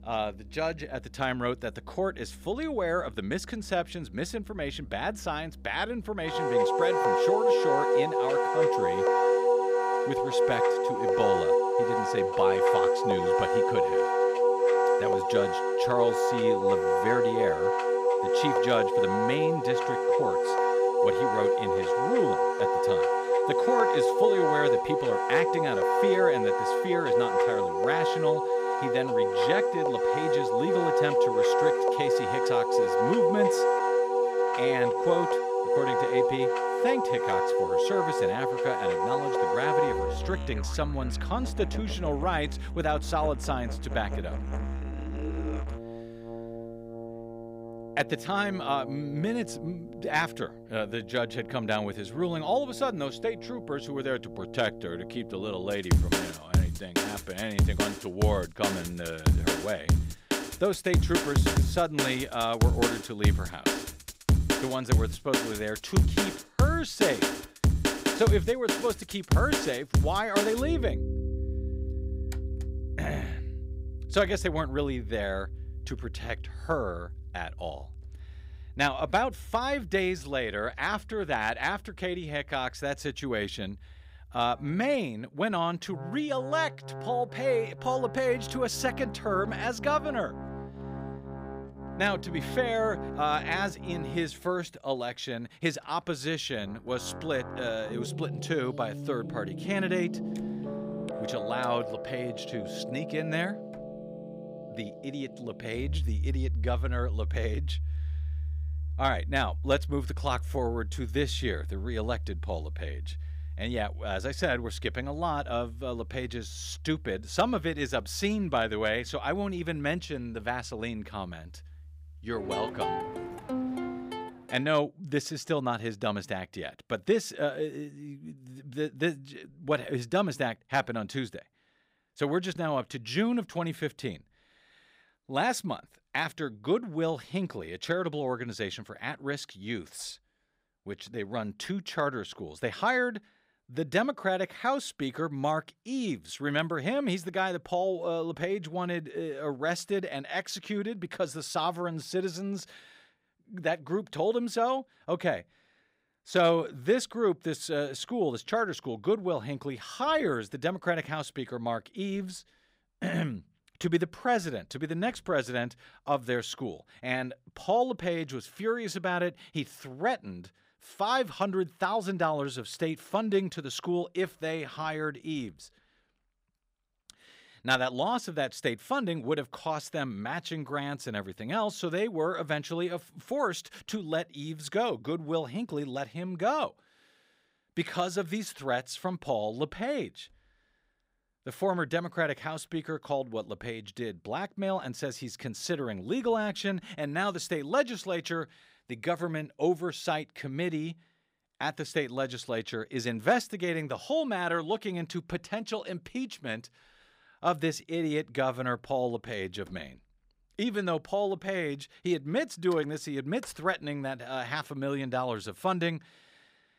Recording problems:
background music; very loud; until 2:04; 4 dB above the speech

